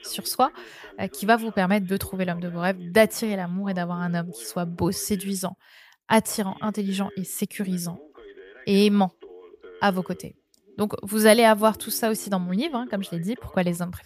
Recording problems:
voice in the background; faint; throughout; 25 dB below the speech

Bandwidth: 15 kHz